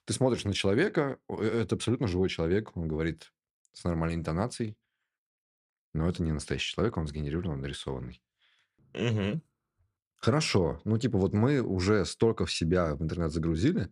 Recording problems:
none

